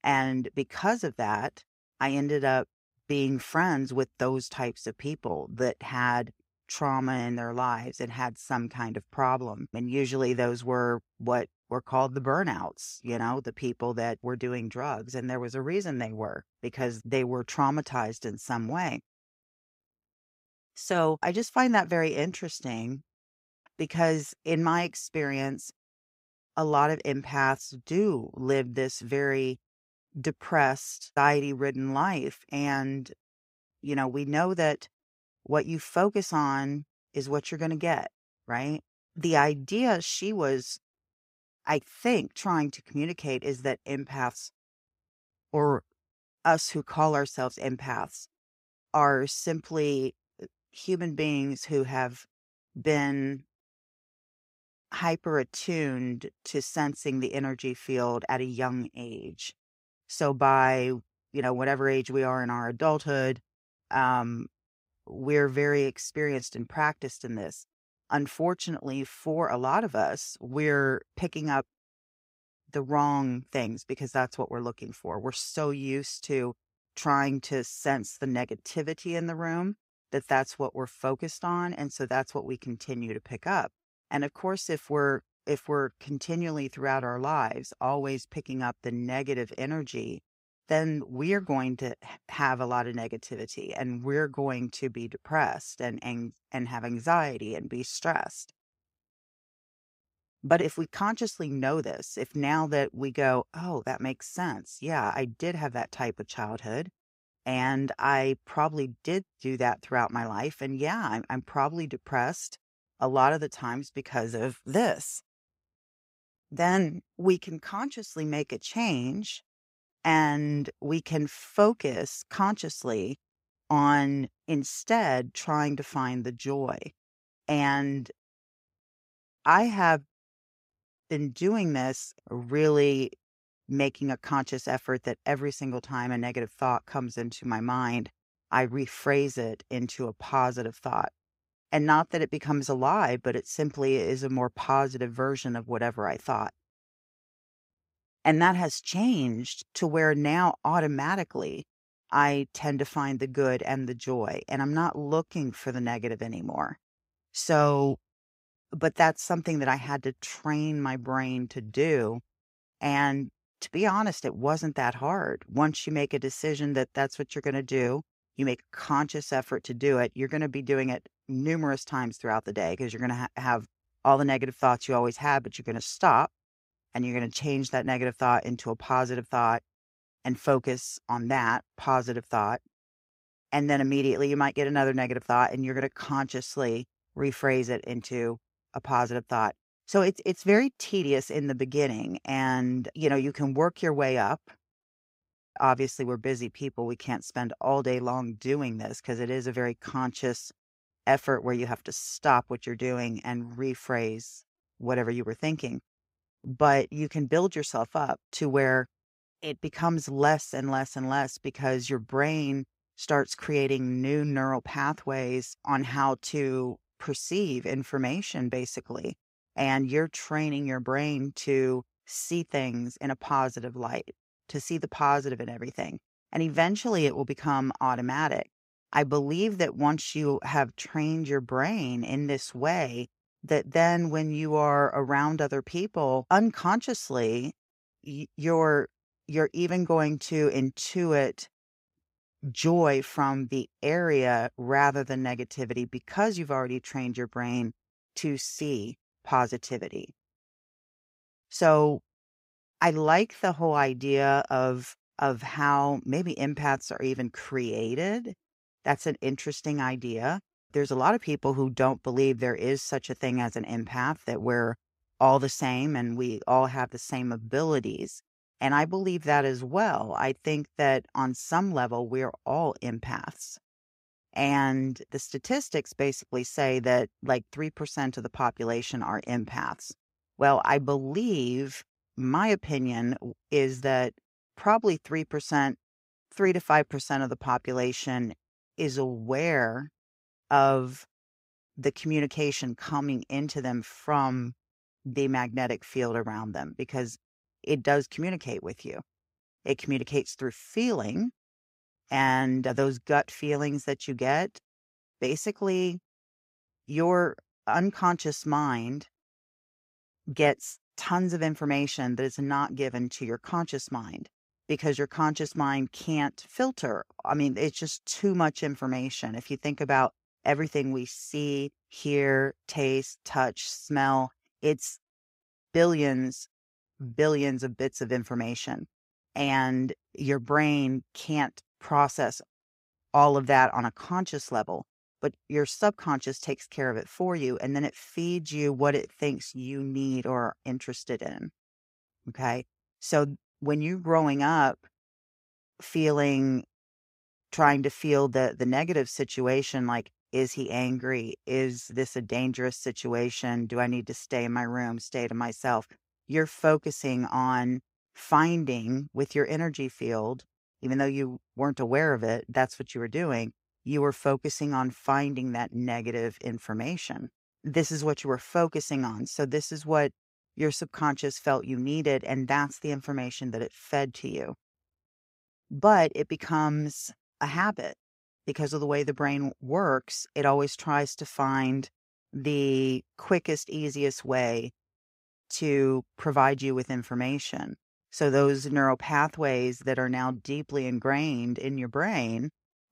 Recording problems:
none

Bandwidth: 15.5 kHz